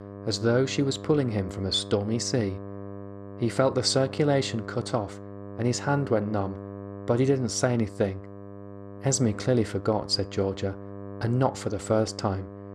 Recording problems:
electrical hum; noticeable; throughout; 50 Hz, 15 dB below the speech

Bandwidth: 14 kHz